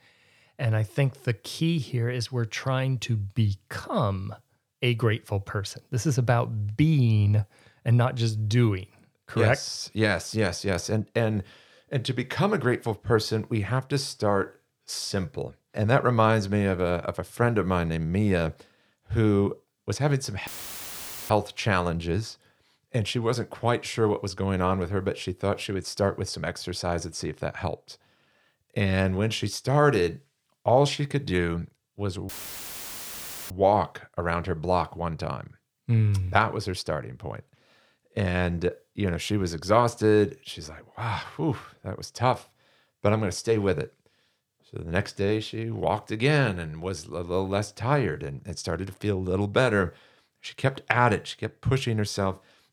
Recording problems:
audio cutting out; filled with static; at 20 s for 1 s and at 32 s for 1 s

